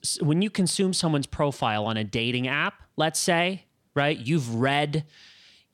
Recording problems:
none

